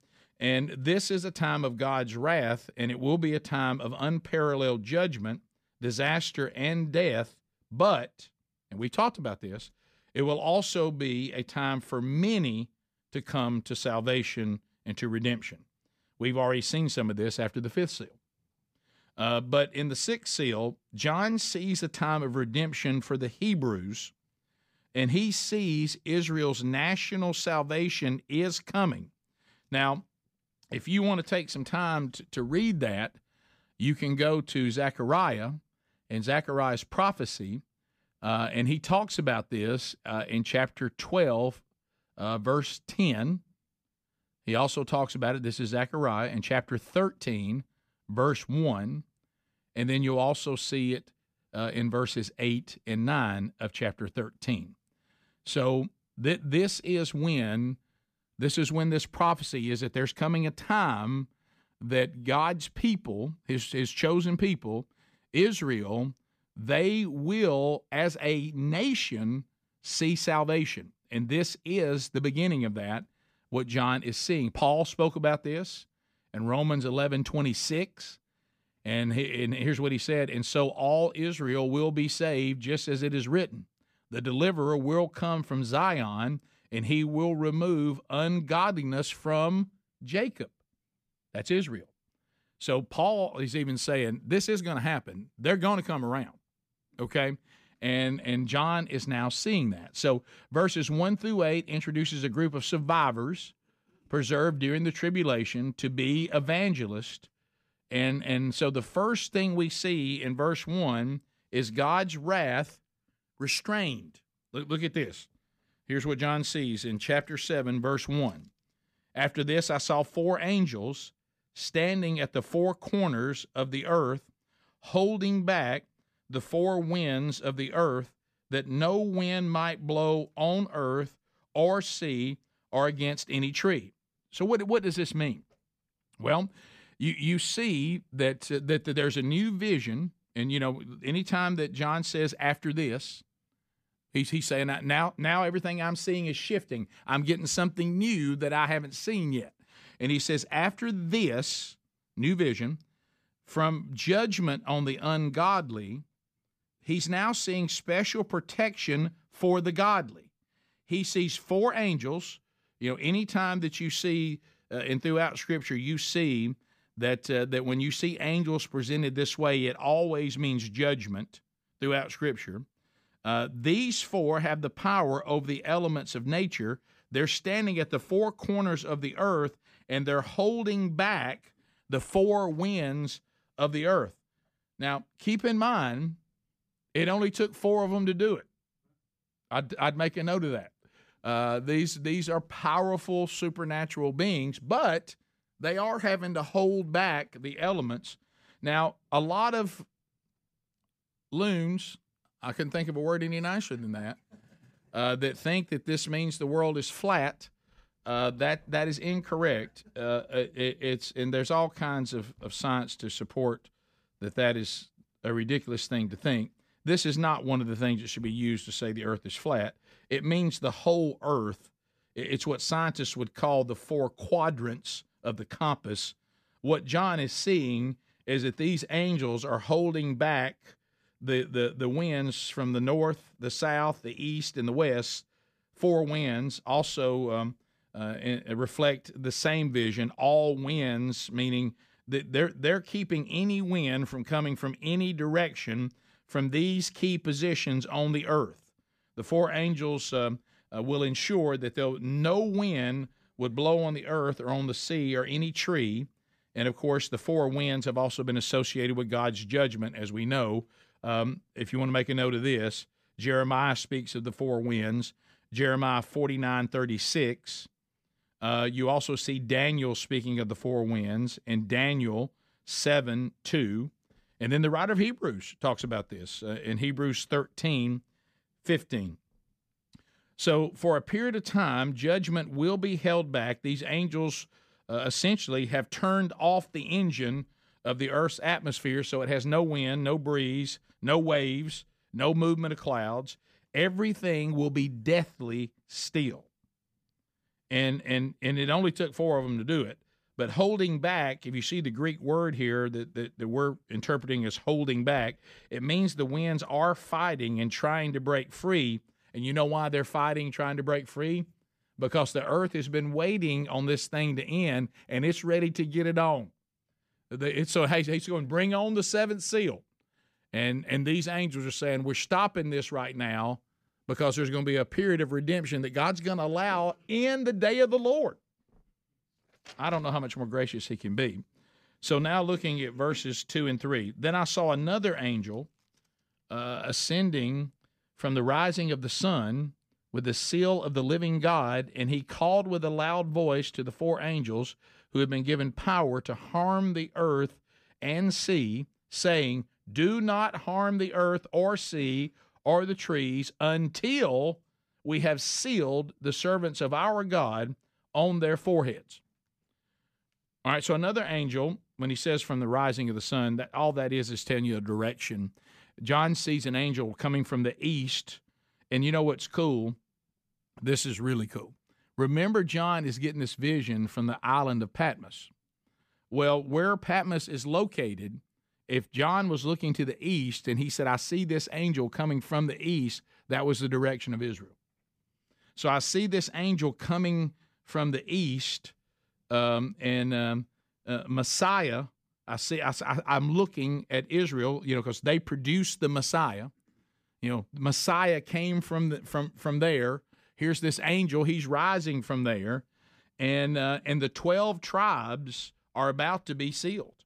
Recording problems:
none

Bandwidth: 15 kHz